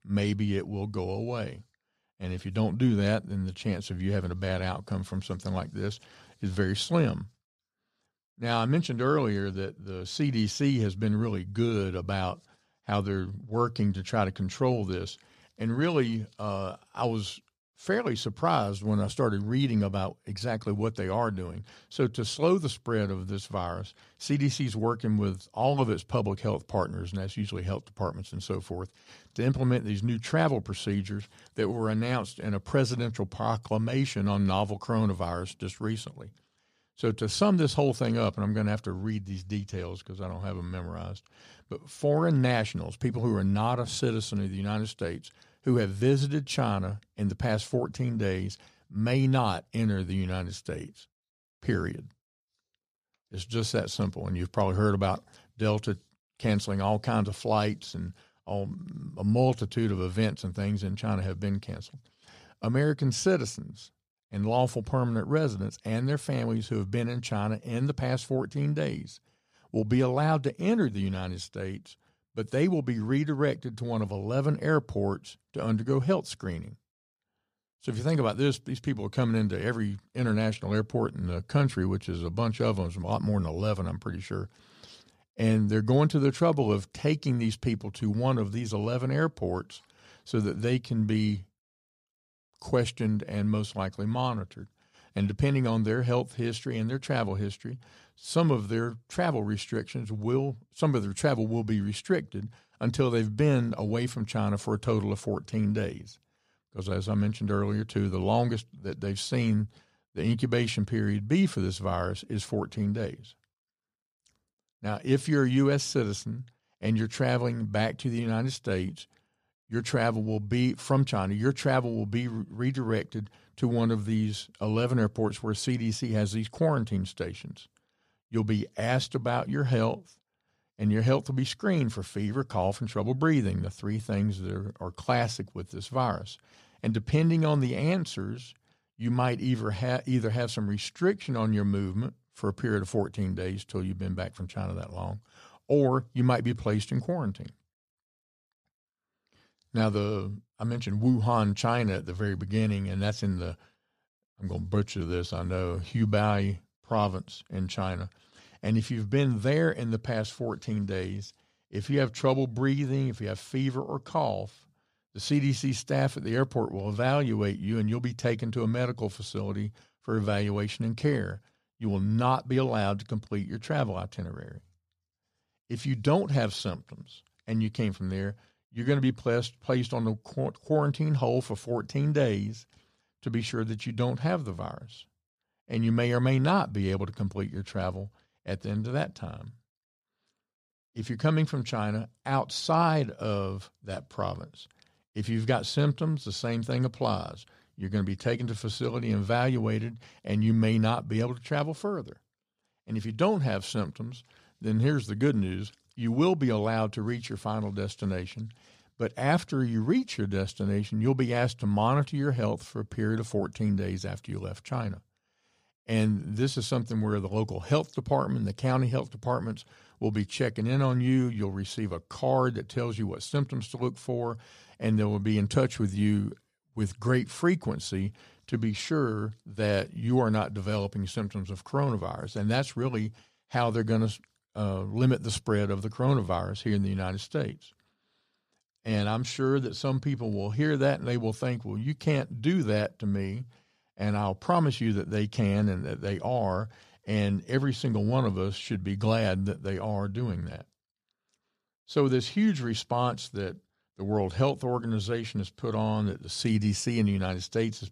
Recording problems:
none

